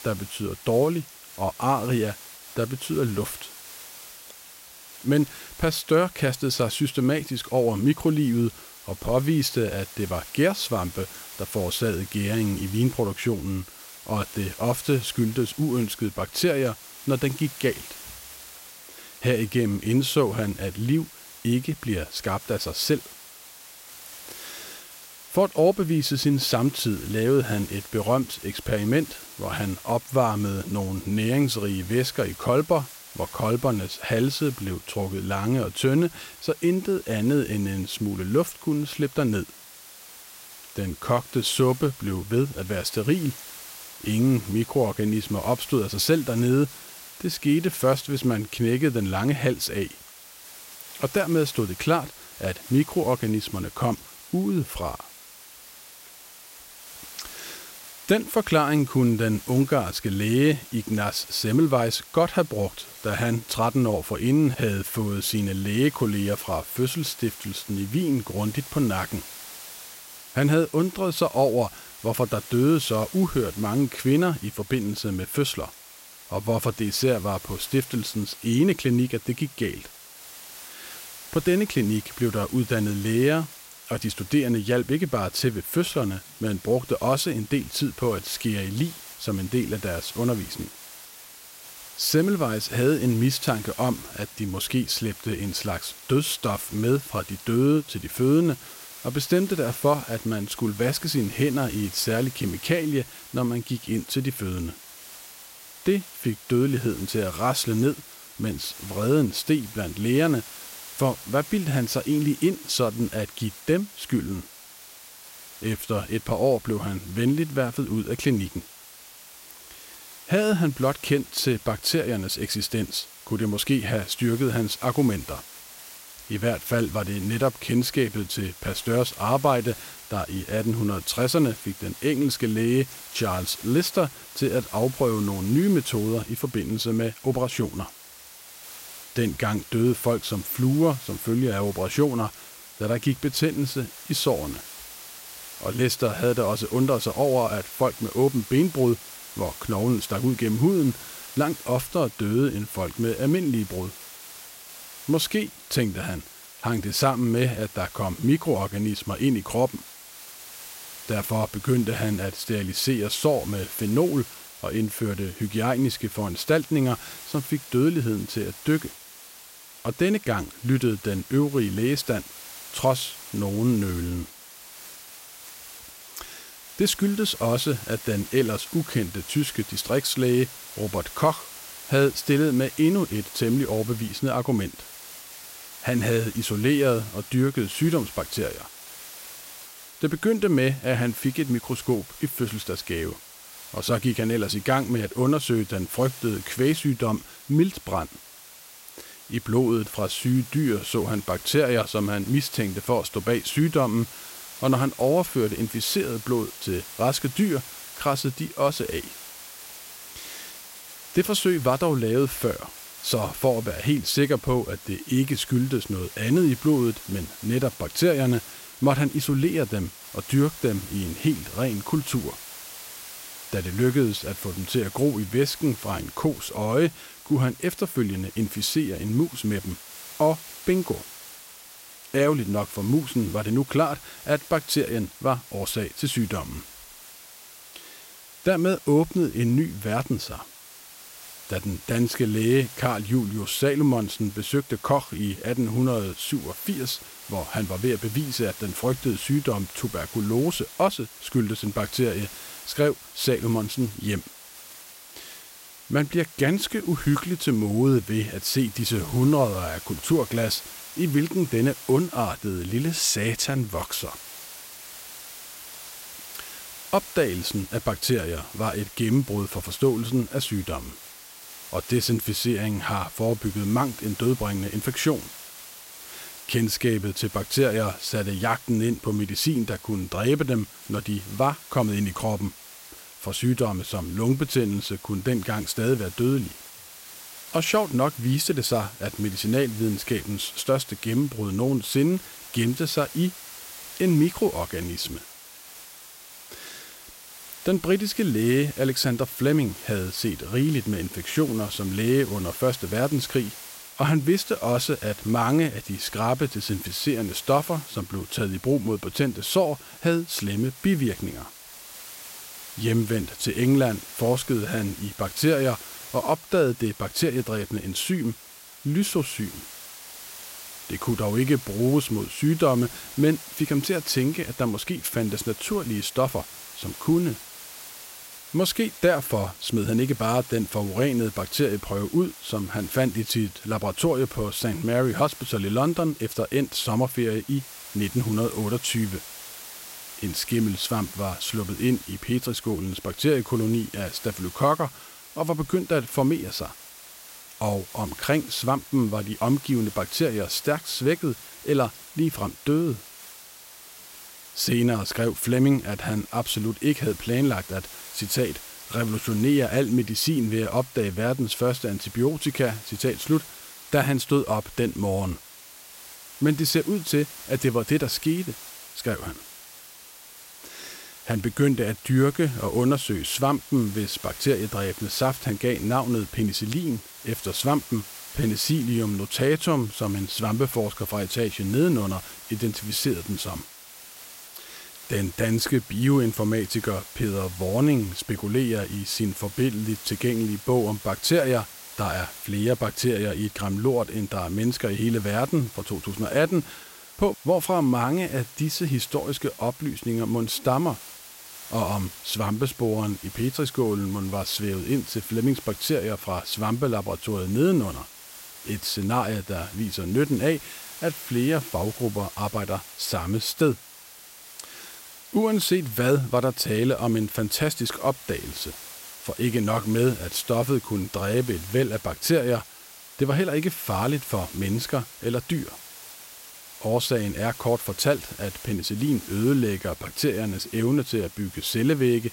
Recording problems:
hiss; noticeable; throughout; 15 dB below the speech

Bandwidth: 16 kHz